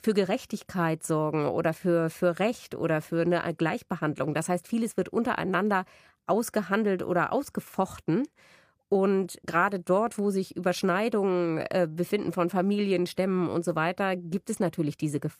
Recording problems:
none

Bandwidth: 15 kHz